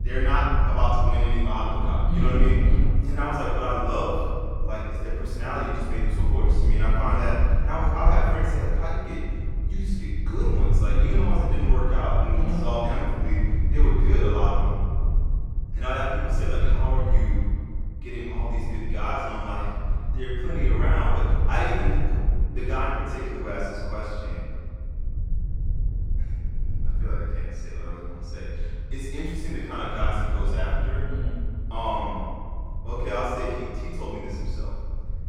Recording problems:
room echo; strong; dies away in 1.7 s
off-mic speech; far
low rumble; noticeable; throughout; 15 dB below the speech

